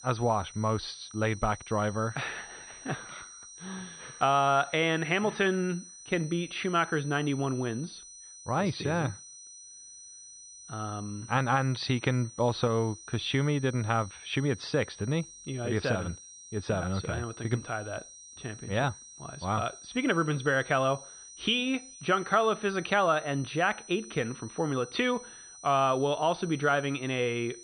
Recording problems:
muffled; slightly; fading above 4 kHz
high-pitched whine; noticeable; throughout; 6 kHz, 15 dB below the speech

